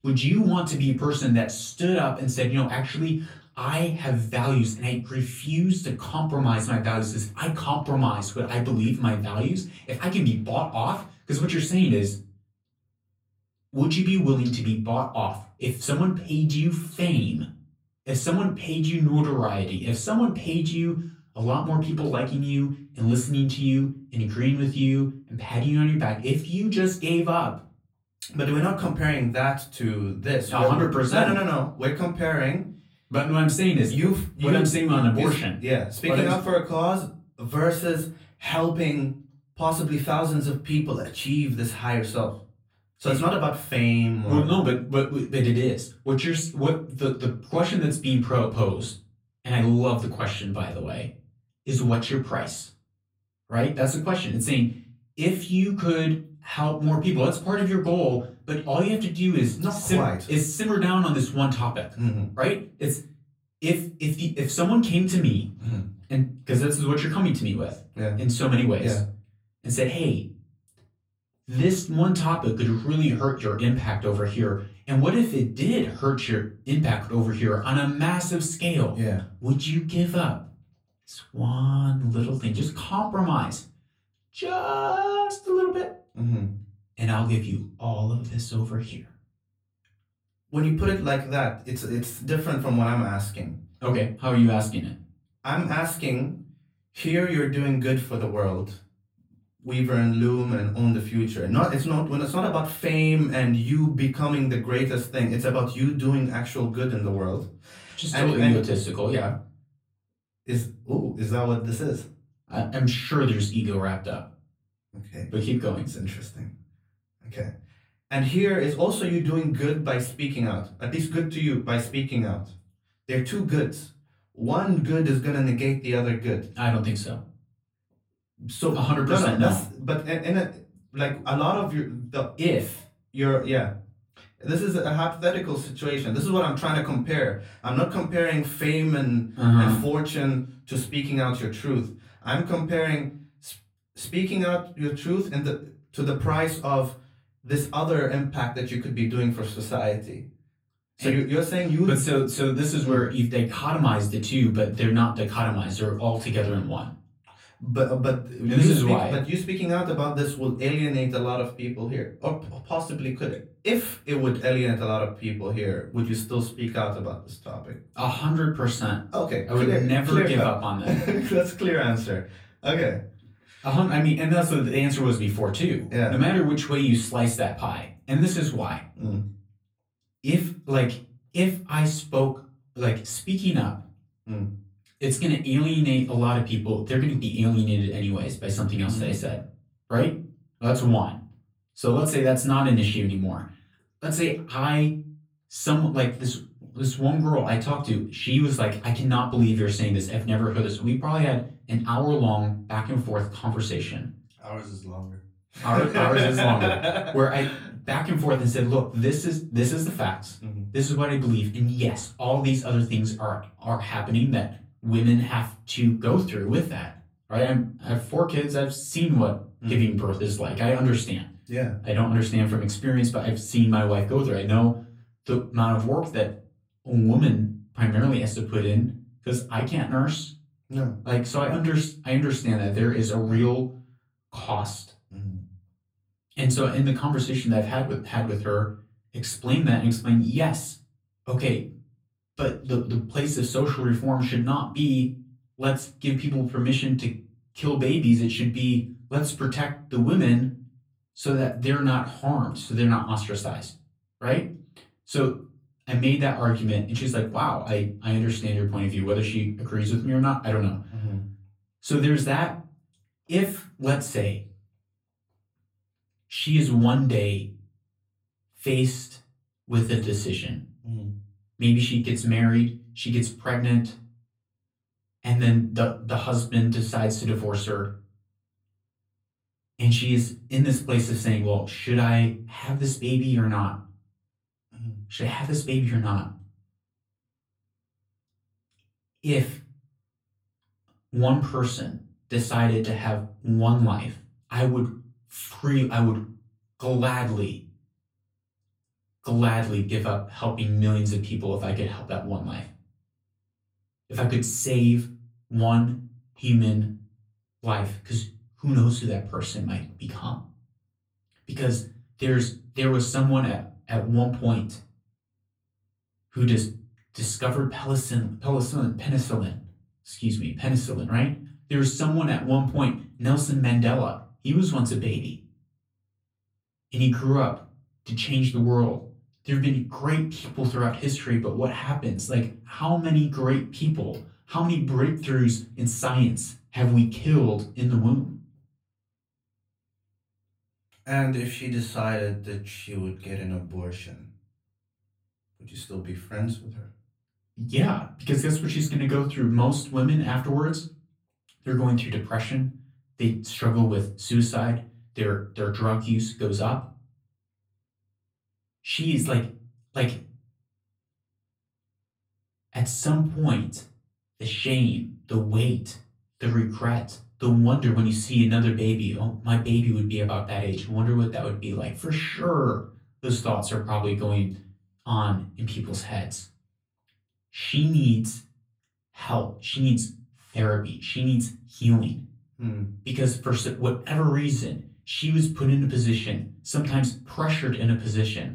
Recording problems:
off-mic speech; far
room echo; slight; dies away in 0.3 s

